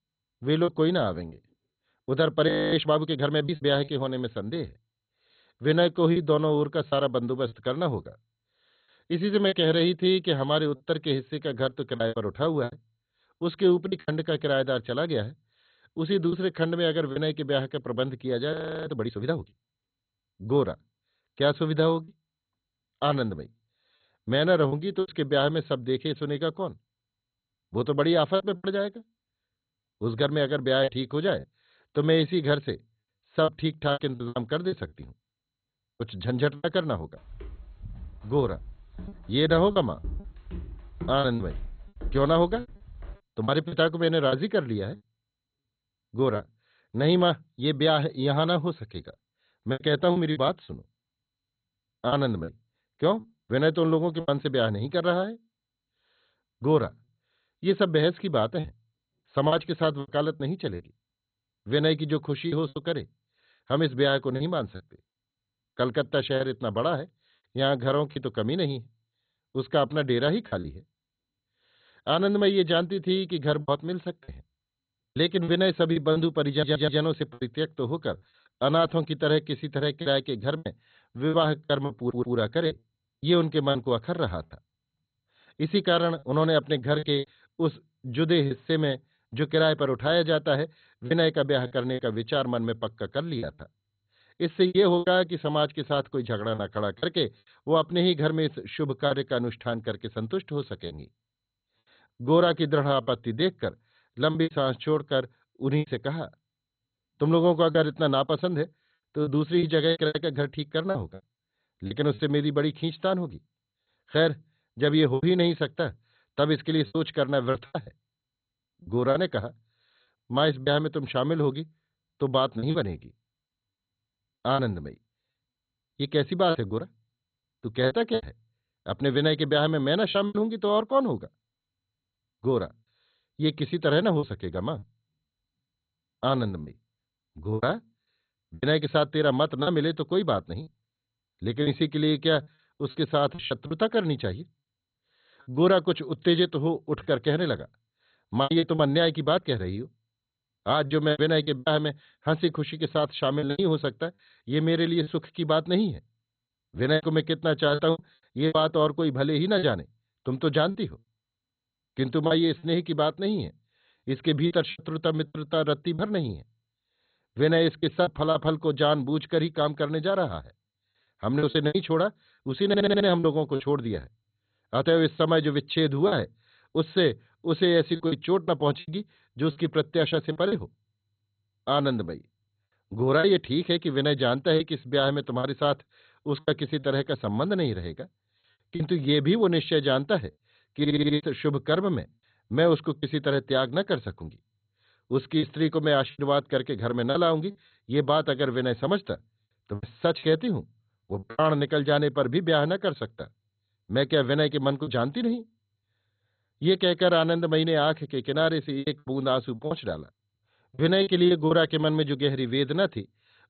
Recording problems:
garbled, watery; badly; nothing above 4 kHz
choppy; very; 7% of the speech affected
audio freezing; at 2.5 s and at 19 s
footsteps; faint; from 37 to 43 s; peak 10 dB below the speech
audio stuttering; 4 times, first at 1:17

